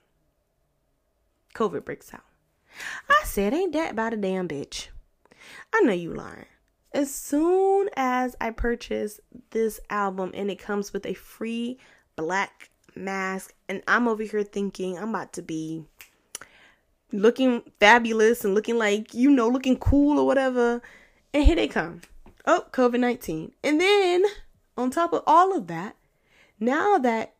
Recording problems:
none

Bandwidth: 15 kHz